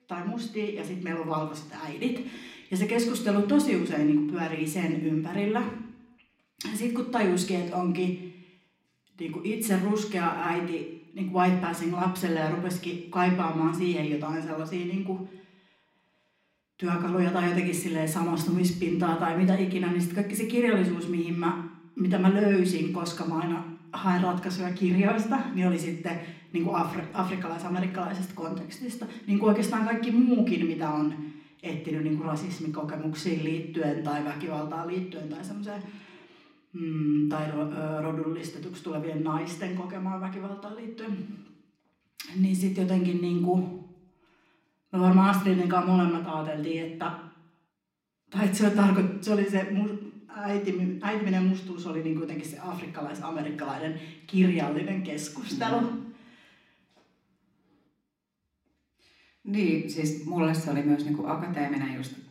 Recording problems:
room echo; slight; dies away in 0.8 s
off-mic speech; somewhat distant

